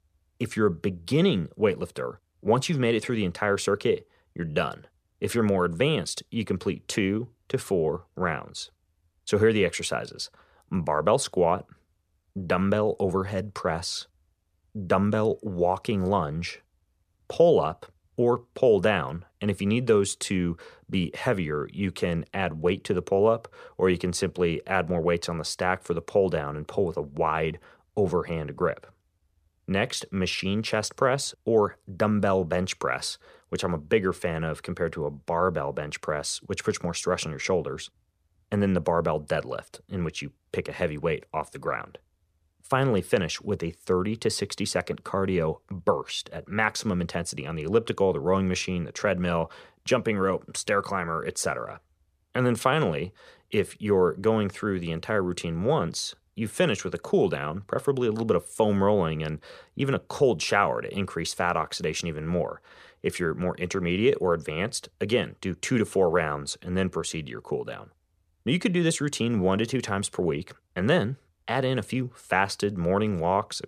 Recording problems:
none

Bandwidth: 15 kHz